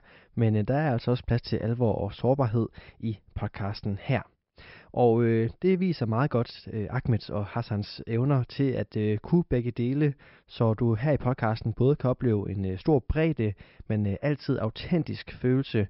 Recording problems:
high frequencies cut off; noticeable; nothing above 5.5 kHz

